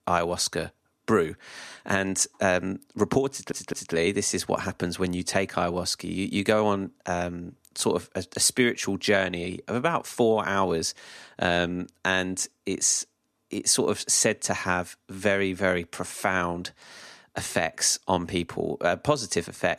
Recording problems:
audio stuttering; at 3.5 s

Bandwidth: 13.5 kHz